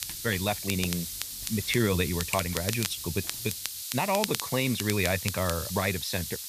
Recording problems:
hiss; loud; throughout; 5 dB below the speech
crackle, like an old record; loud; 7 dB below the speech
footsteps; noticeable; until 2.5 s; peak 7 dB below the speech
uneven, jittery; slightly; from 0.5 to 4.5 s

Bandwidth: 14.5 kHz